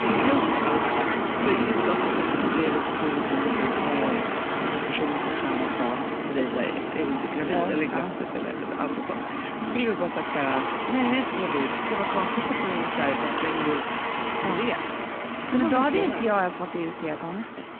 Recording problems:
phone-call audio
traffic noise; very loud; throughout; 1 dB above the speech

